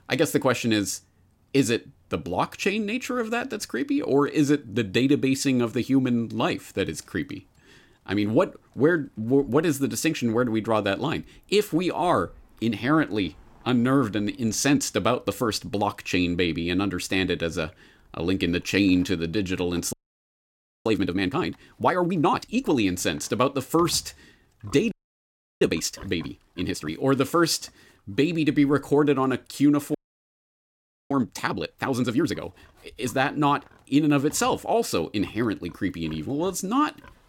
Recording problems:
animal sounds; faint; throughout; 30 dB below the speech
audio freezing; at 20 s for 1 s, at 25 s for 0.5 s and at 30 s for 1 s

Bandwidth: 16.5 kHz